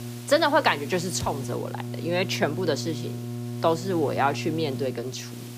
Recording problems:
electrical hum; noticeable; throughout; 60 Hz, 15 dB below the speech
hiss; faint; throughout; 20 dB below the speech

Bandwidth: 15 kHz